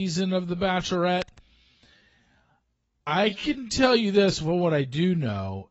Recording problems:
garbled, watery; badly; nothing above 8 kHz
wrong speed, natural pitch; too slow; 0.6 times normal speed
abrupt cut into speech; at the start
uneven, jittery; strongly; from 0.5 to 5 s

